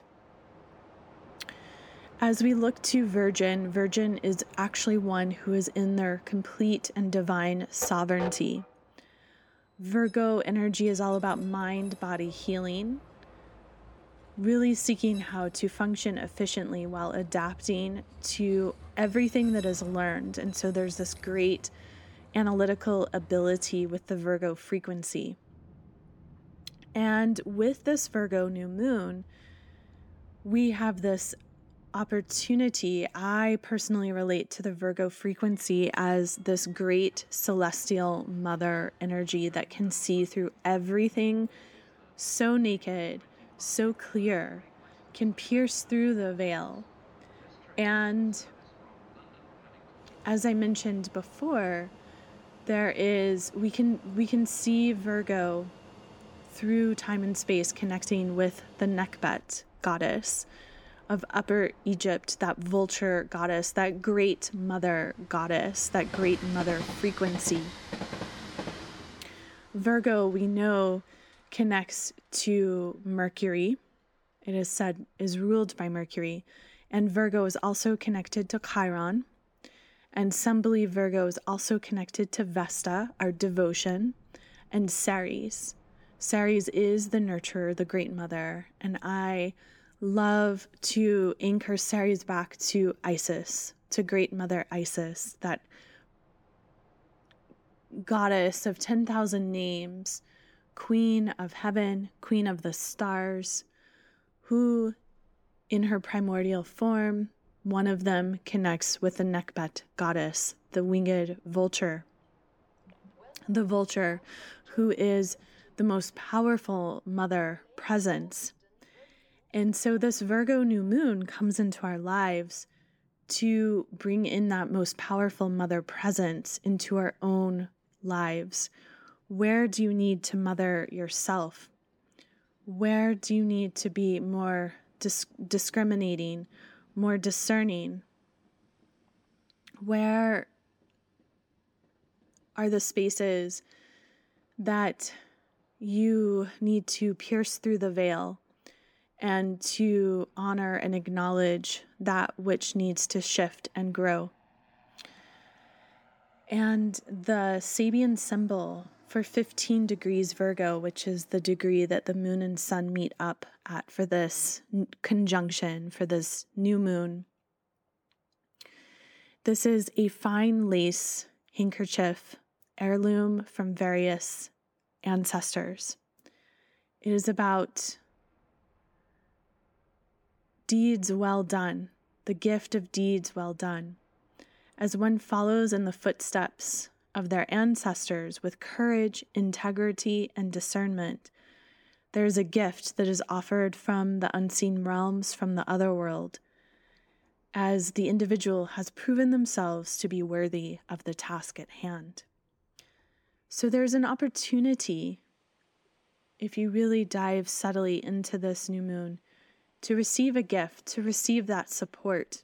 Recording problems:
train or aircraft noise; faint; throughout; 20 dB below the speech

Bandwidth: 18.5 kHz